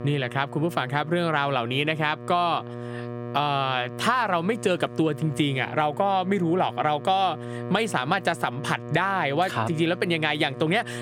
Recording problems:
squashed, flat; somewhat
electrical hum; noticeable; throughout; 60 Hz, 20 dB below the speech

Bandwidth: 18 kHz